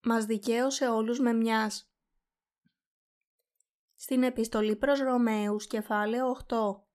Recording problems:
none

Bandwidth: 14 kHz